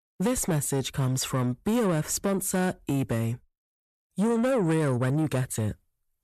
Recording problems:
distortion; slight; 10 dB below the speech

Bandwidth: 13.5 kHz